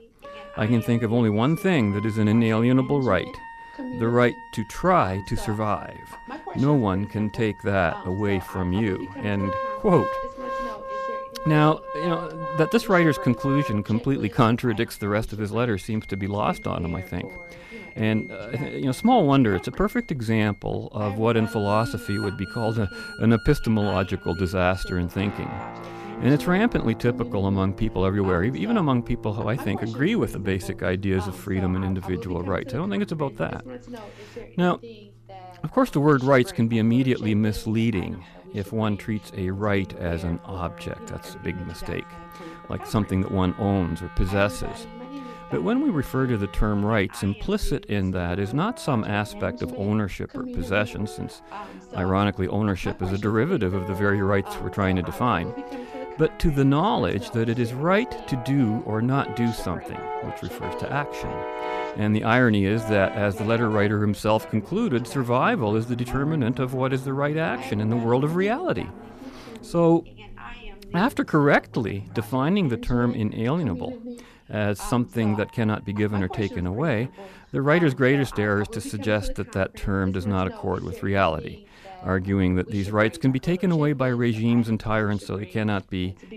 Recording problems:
background music; noticeable; throughout; 15 dB below the speech
voice in the background; noticeable; throughout; 15 dB below the speech

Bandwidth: 14.5 kHz